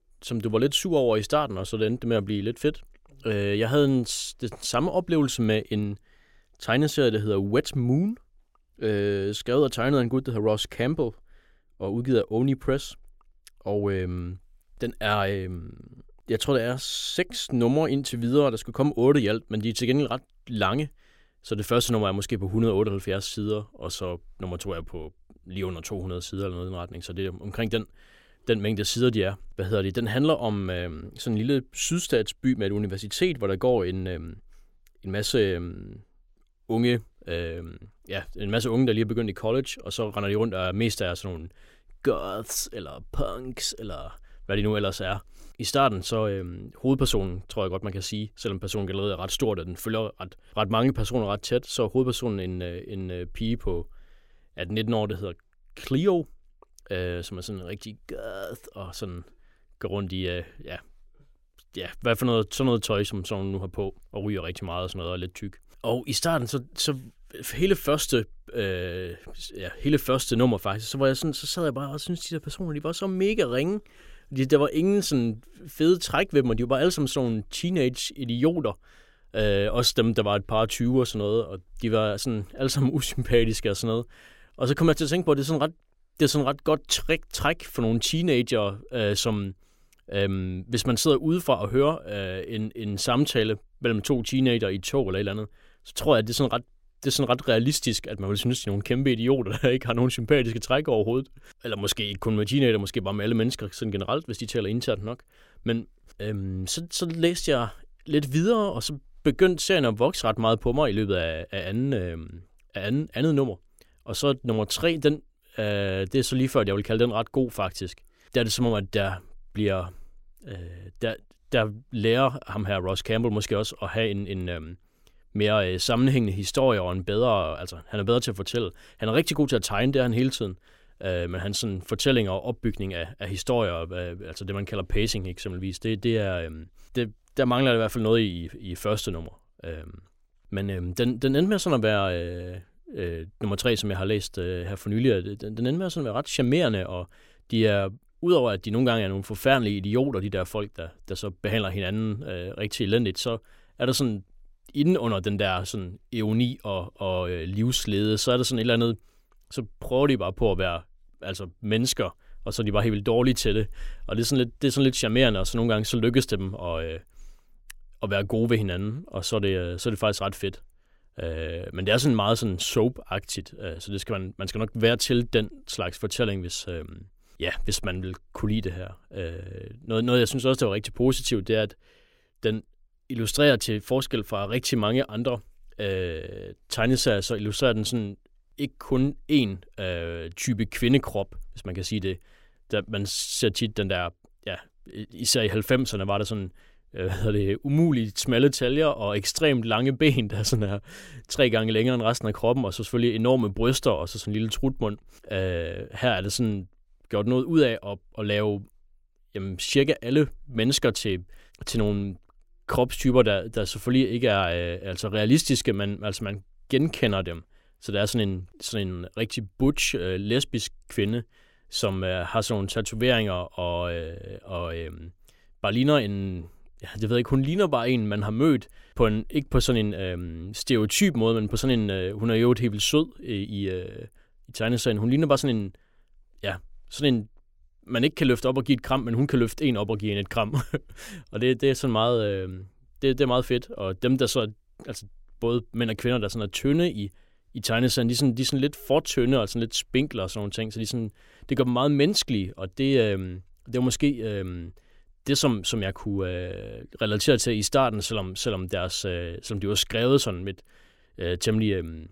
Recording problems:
none

